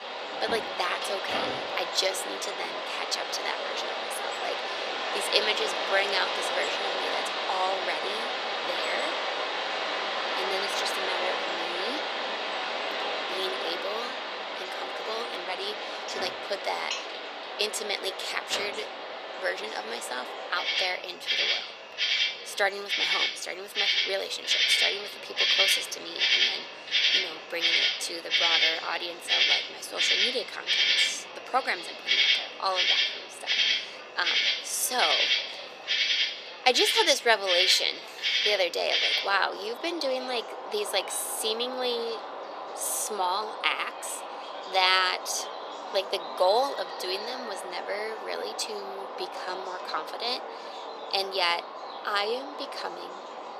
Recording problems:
thin; very; fading below 450 Hz
animal sounds; very loud; throughout; 2 dB above the speech
chatter from many people; noticeable; throughout; 20 dB below the speech

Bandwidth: 14 kHz